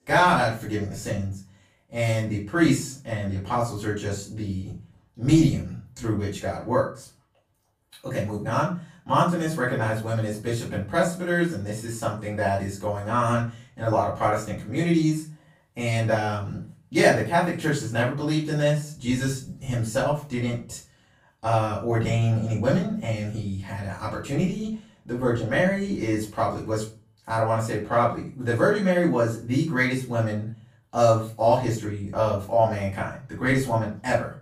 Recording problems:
off-mic speech; far
room echo; slight; dies away in 0.3 s

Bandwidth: 15 kHz